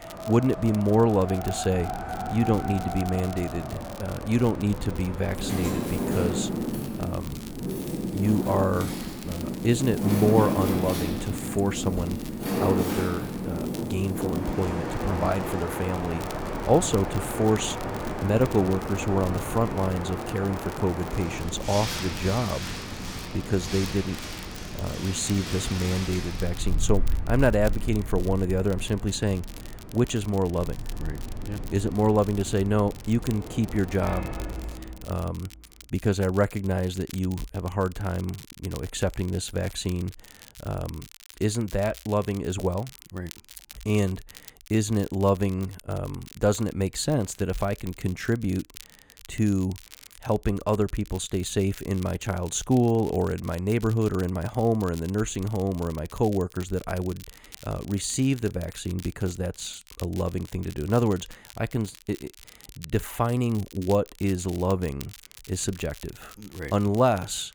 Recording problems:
wind in the background; loud; until 34 s; 5 dB below the speech
crackle, like an old record; noticeable; 20 dB below the speech

